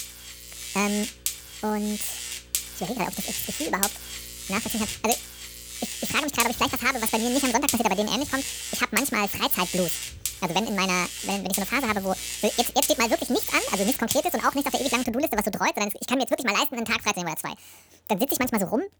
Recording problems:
wrong speed and pitch; too fast and too high; 1.7 times normal speed
electrical hum; loud; until 15 s; 60 Hz, 8 dB below the speech

